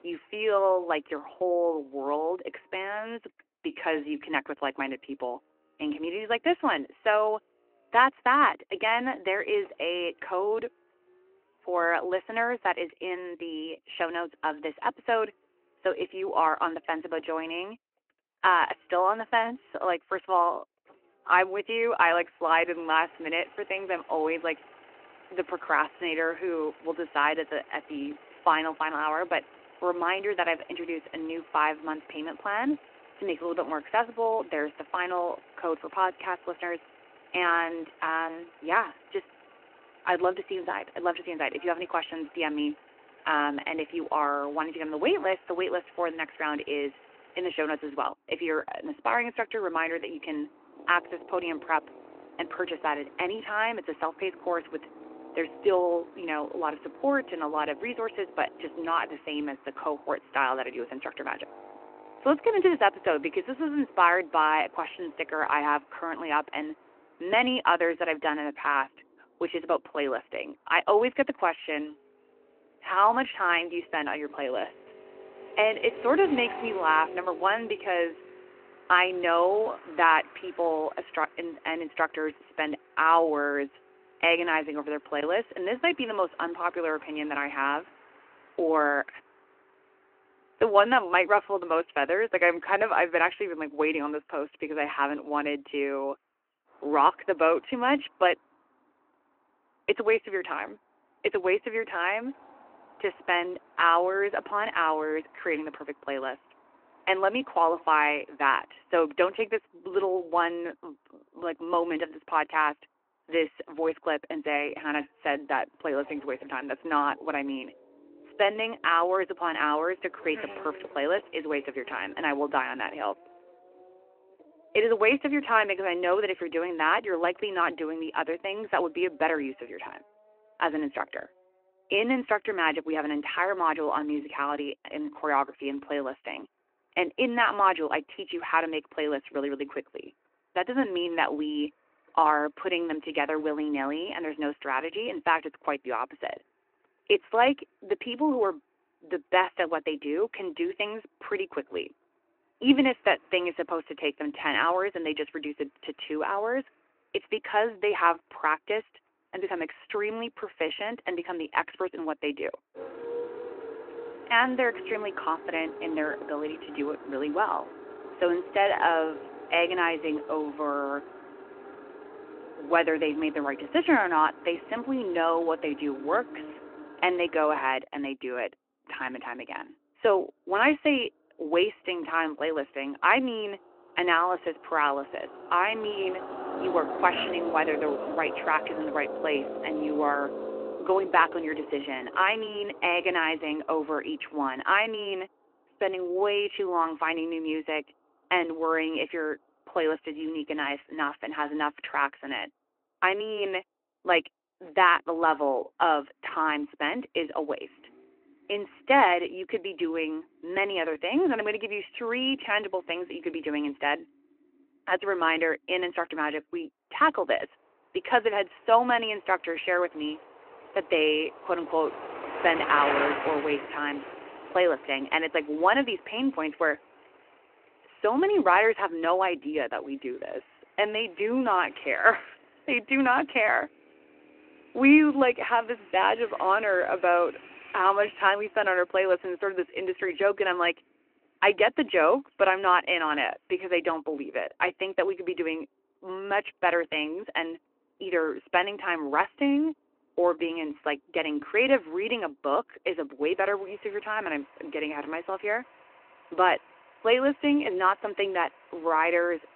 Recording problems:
phone-call audio
traffic noise; noticeable; throughout; 15 dB below the speech

